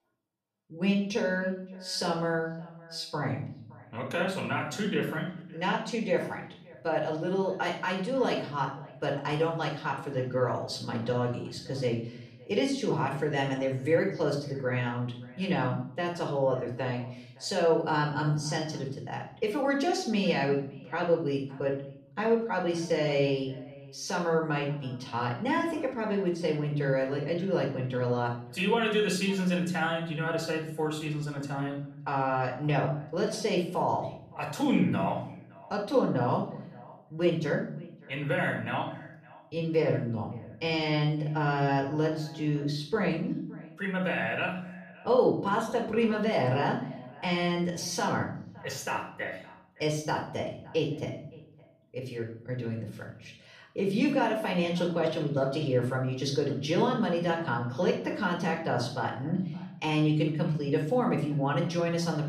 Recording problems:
off-mic speech; far
echo of what is said; faint; throughout; 570 ms later, 25 dB below the speech
room echo; slight; dies away in 0.6 s

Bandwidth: 14.5 kHz